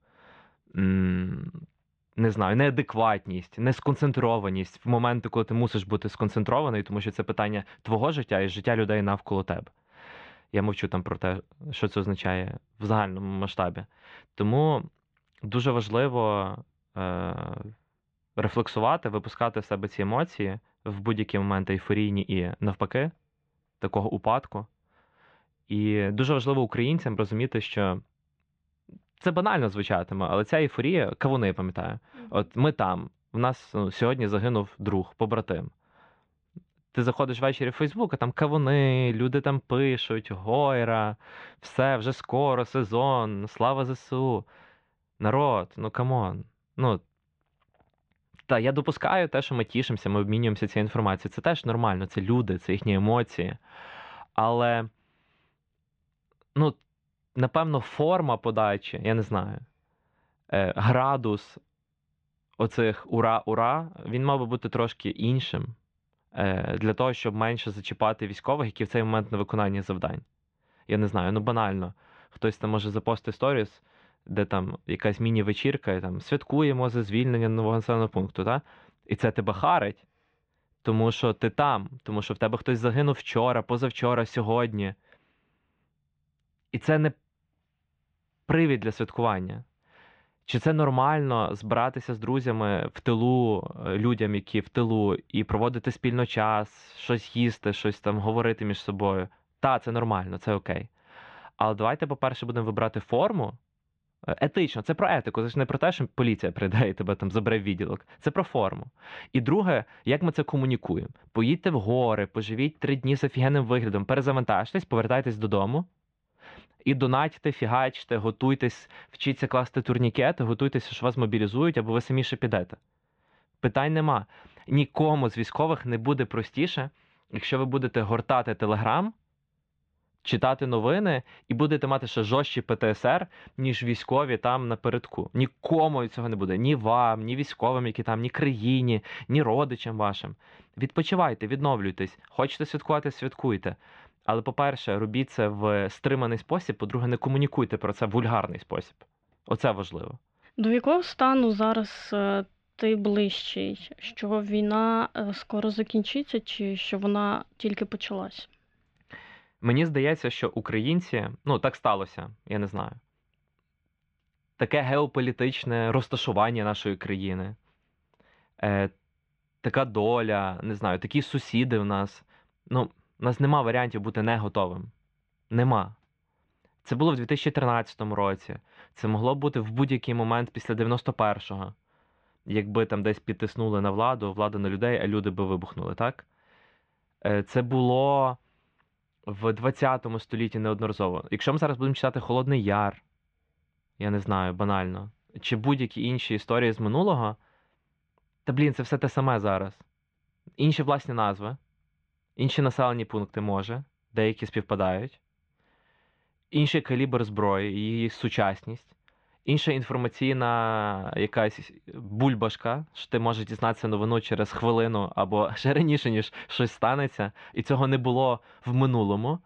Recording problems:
muffled; very; fading above 3.5 kHz

